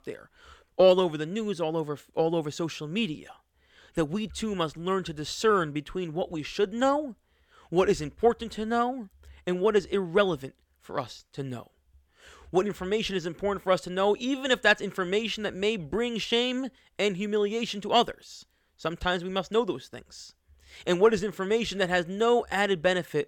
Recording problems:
none

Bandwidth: 17.5 kHz